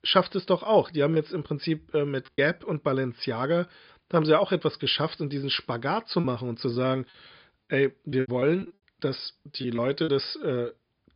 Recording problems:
high frequencies cut off; noticeable; nothing above 5 kHz
choppy; very; from 1 to 2.5 s and from 6 to 10 s; 9% of the speech affected

